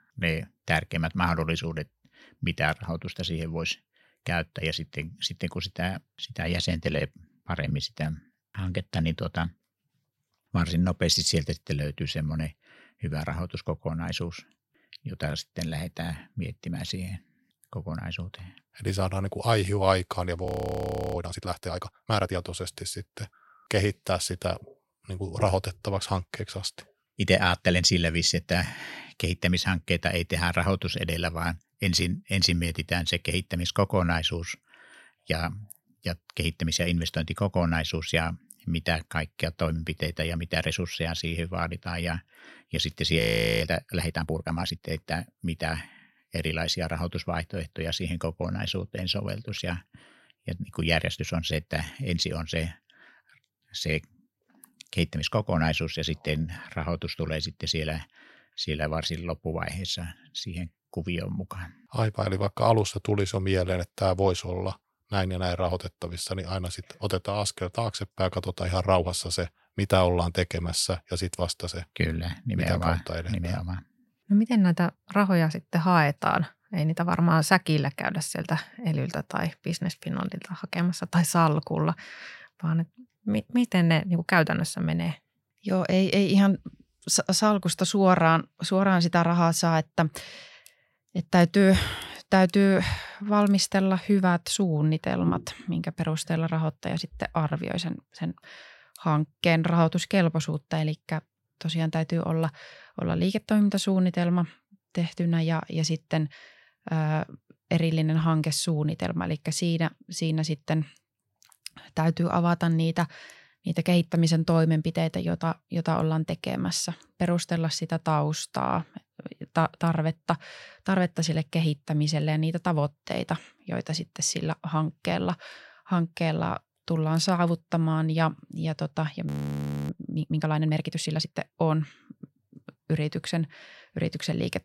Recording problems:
audio freezing; at 20 s for 0.5 s, at 43 s and at 2:09 for 0.5 s

